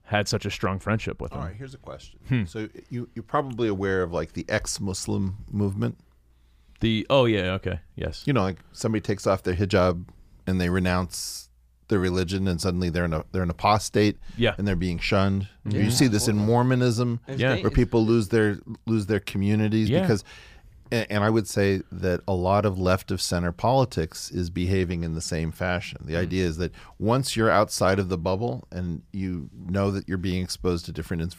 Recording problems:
none

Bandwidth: 15 kHz